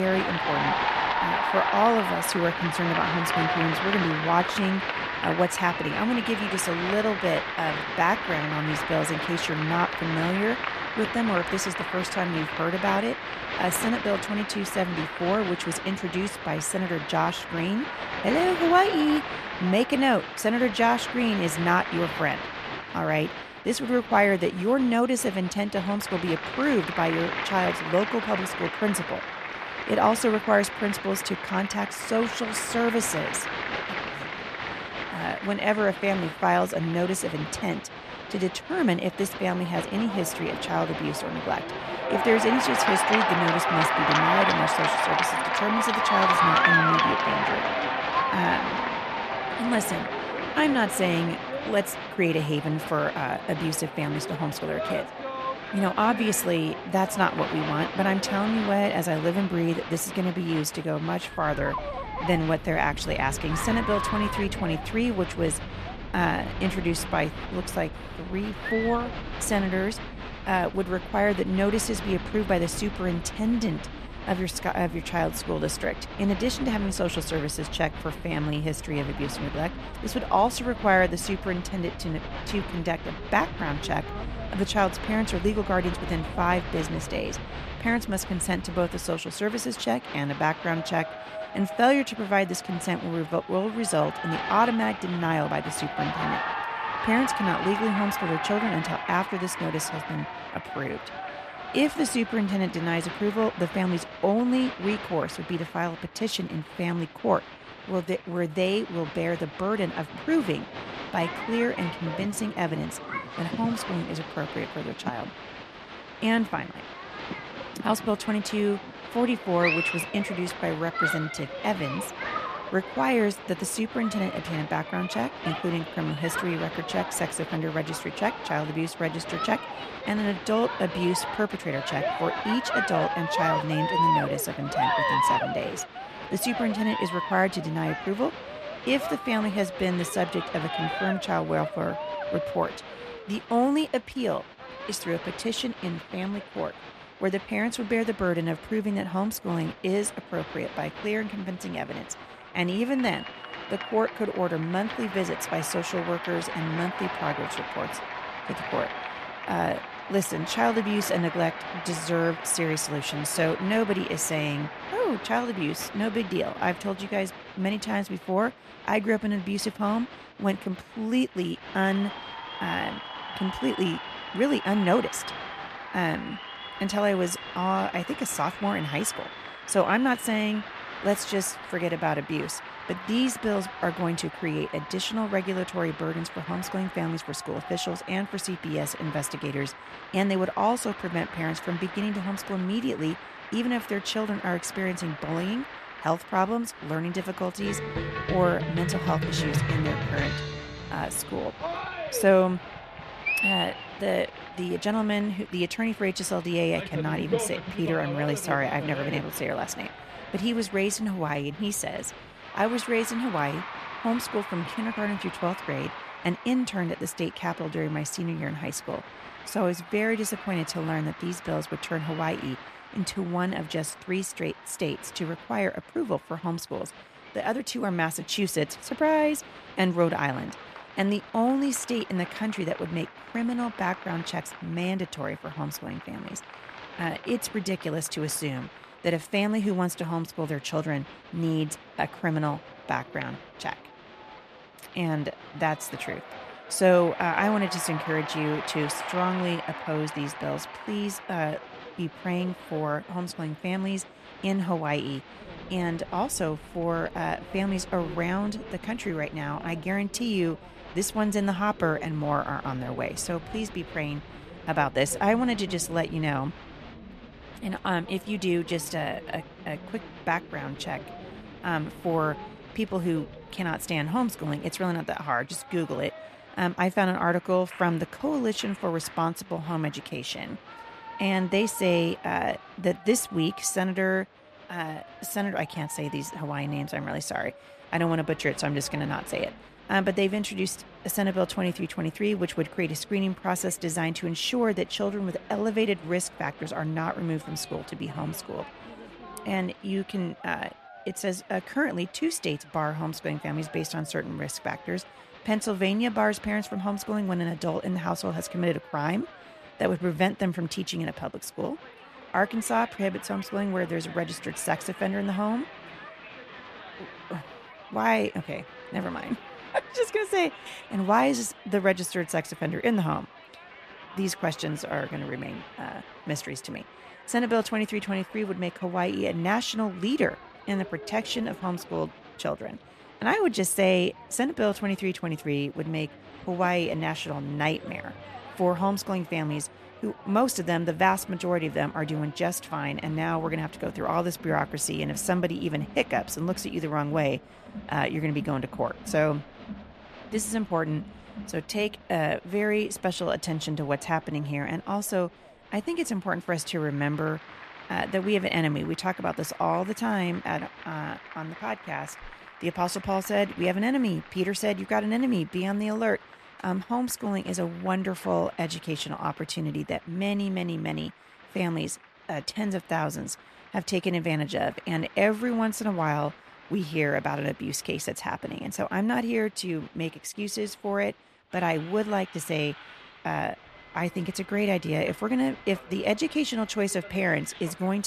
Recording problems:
crowd noise; loud; throughout; 5 dB below the speech
abrupt cut into speech; at the start and the end

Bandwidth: 14 kHz